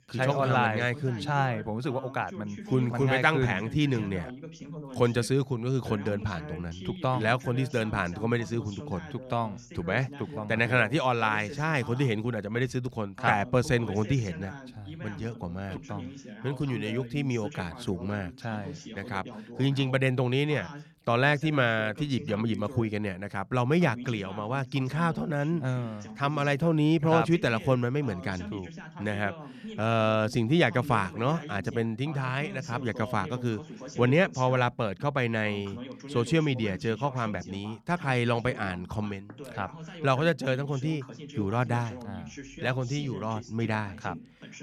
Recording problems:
voice in the background; noticeable; throughout; 15 dB below the speech

